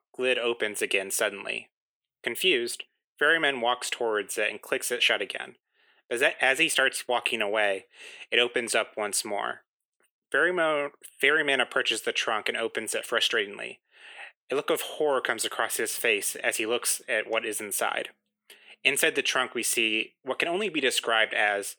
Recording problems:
thin; very; fading below 300 Hz

